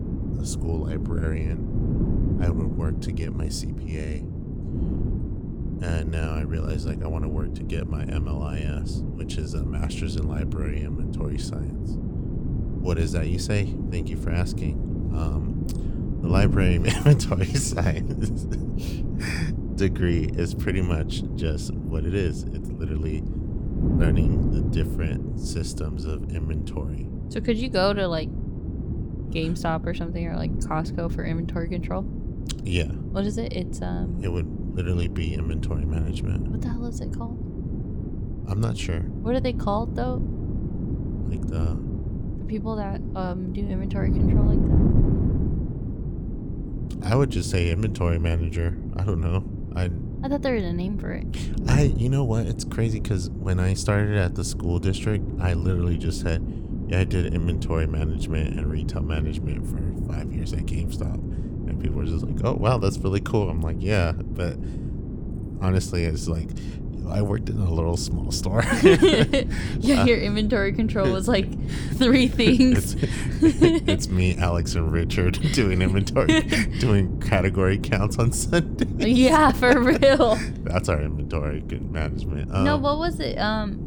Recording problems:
wind noise on the microphone; occasional gusts; 10 dB below the speech

